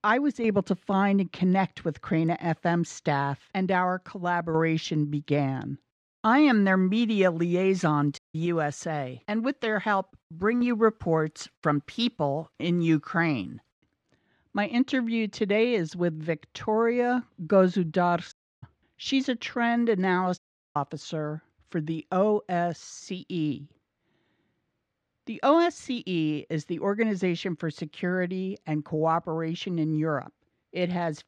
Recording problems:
muffled; slightly; fading above 3 kHz
audio cutting out; at 8 s, at 18 s and at 20 s

